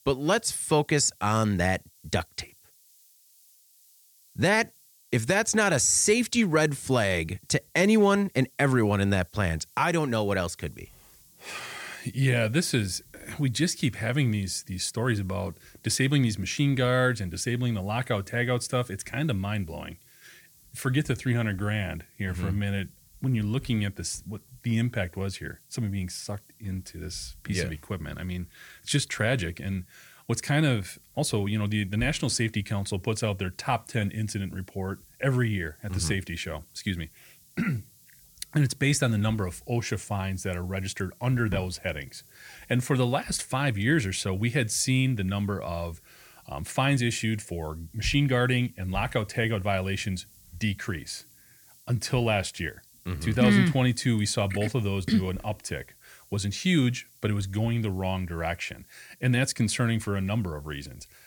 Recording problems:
hiss; faint; throughout; 25 dB below the speech

